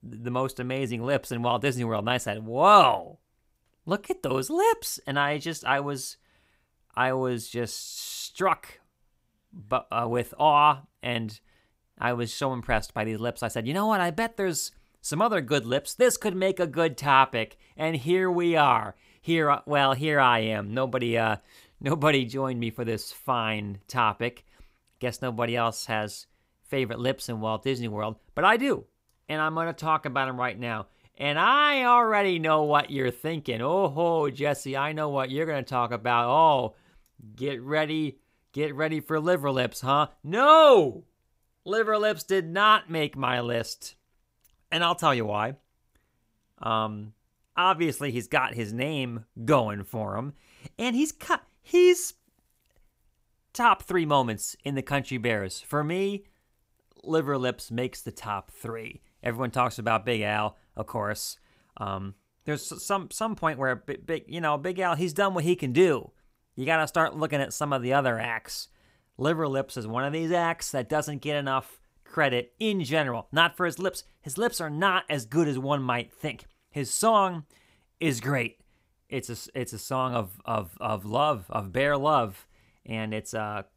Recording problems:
none

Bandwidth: 15.5 kHz